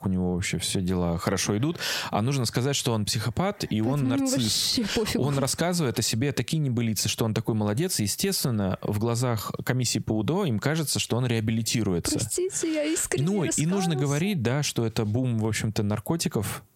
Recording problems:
squashed, flat; heavily

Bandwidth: 16 kHz